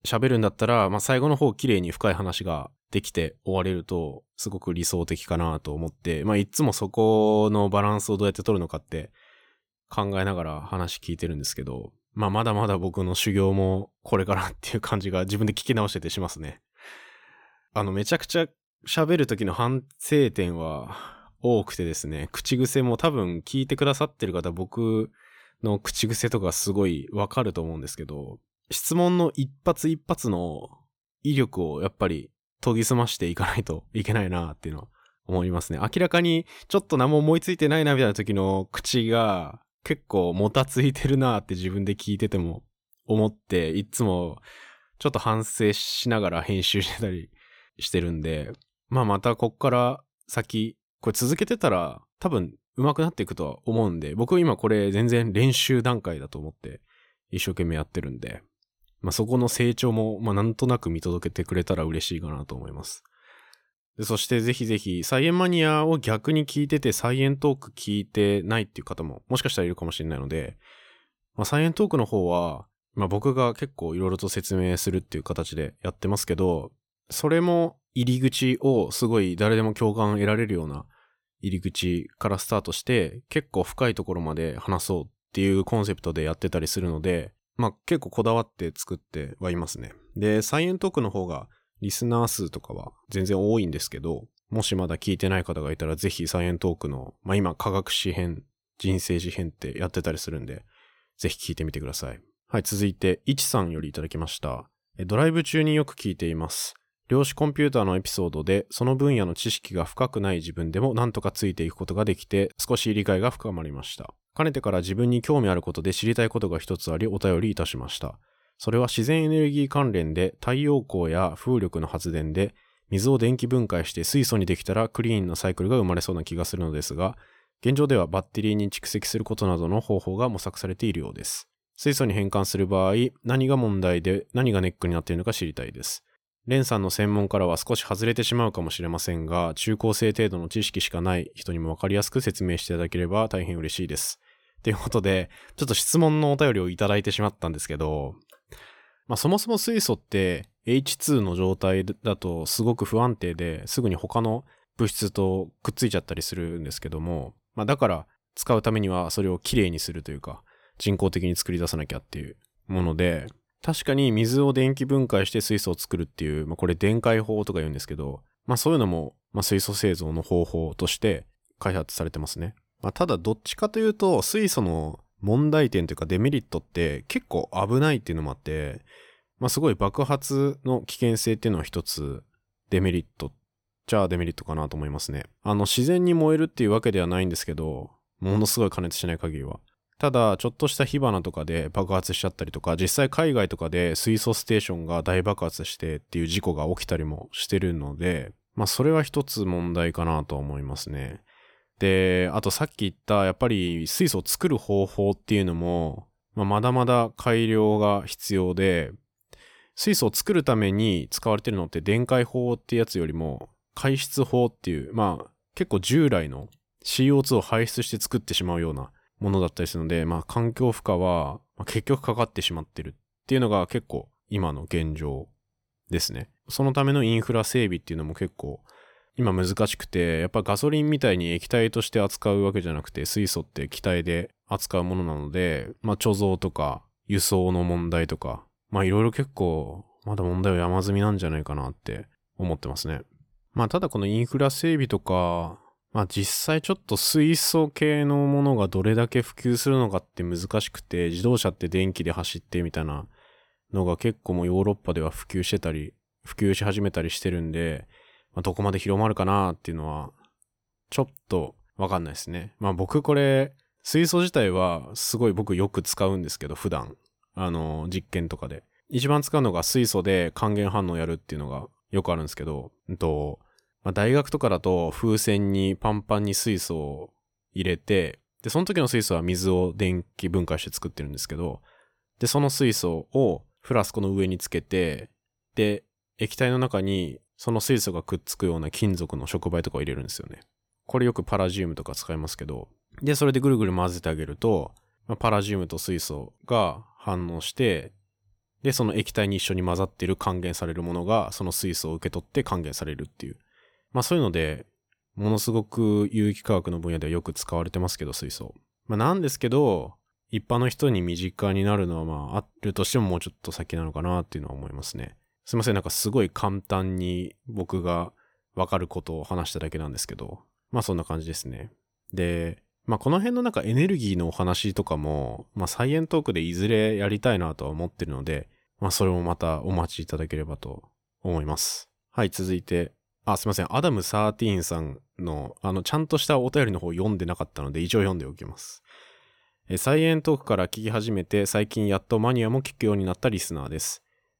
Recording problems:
none

